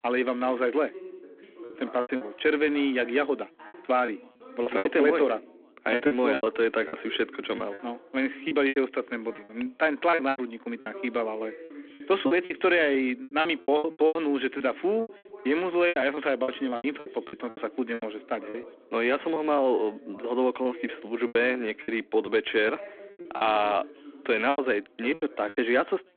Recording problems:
phone-call audio
background chatter; noticeable; throughout; 2 voices, 20 dB below the speech
choppy; very; 12% of the speech affected

